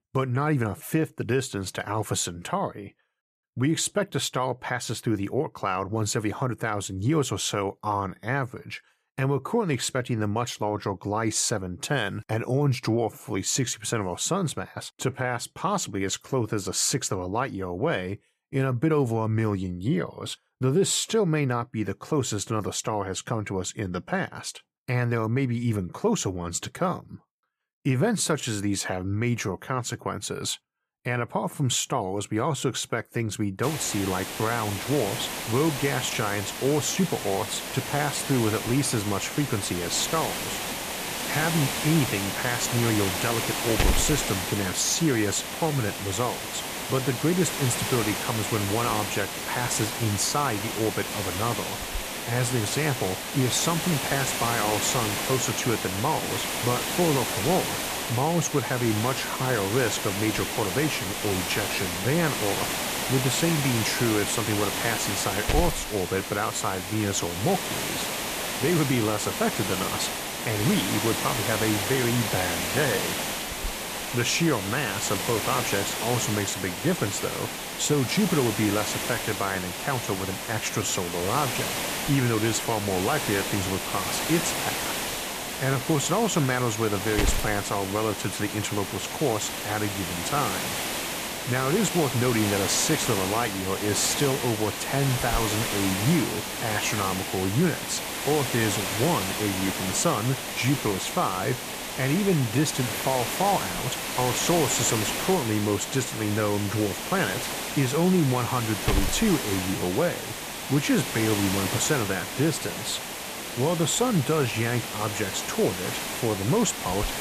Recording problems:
hiss; loud; from 34 s on; 2 dB below the speech

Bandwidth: 14.5 kHz